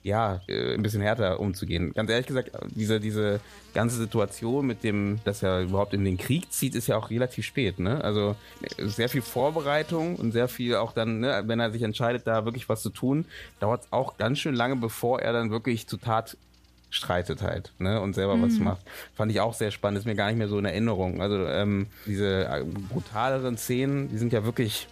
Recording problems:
electrical hum; faint; throughout; 60 Hz, 25 dB below the speech

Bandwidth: 14.5 kHz